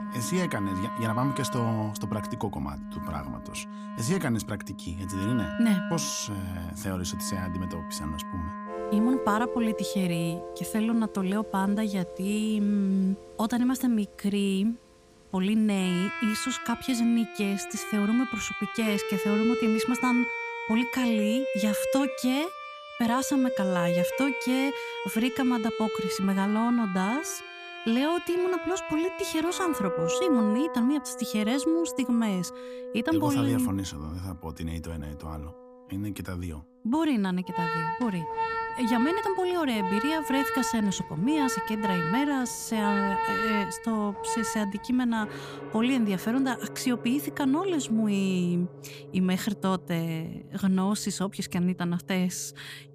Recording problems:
background music; loud; throughout; 6 dB below the speech

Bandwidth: 15 kHz